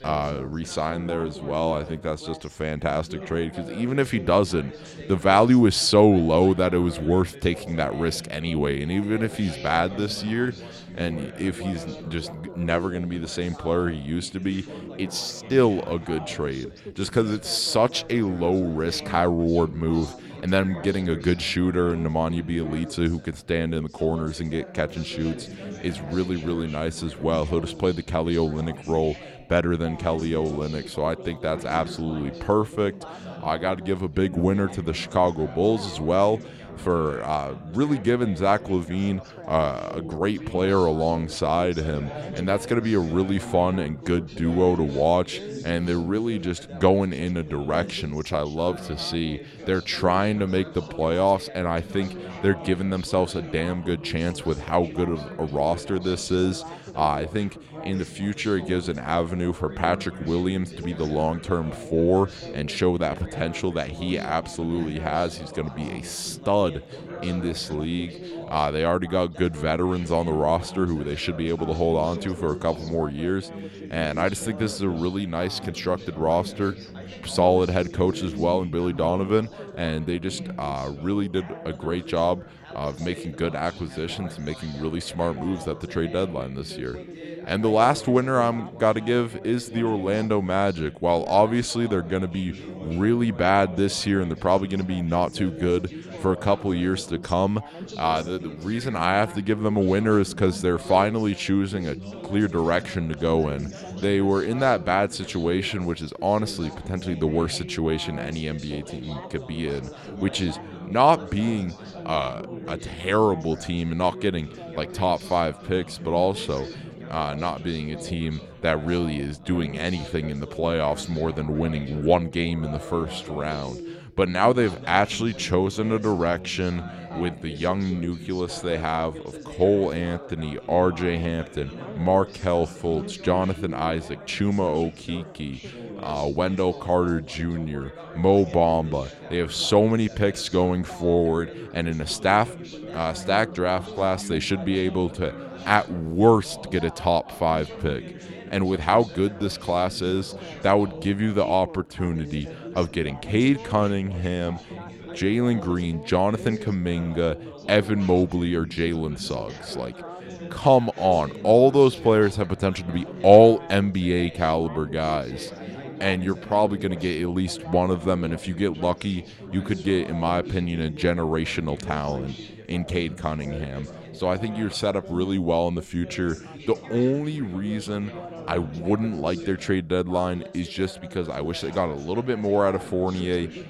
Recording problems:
background chatter; noticeable; throughout; 3 voices, 15 dB below the speech

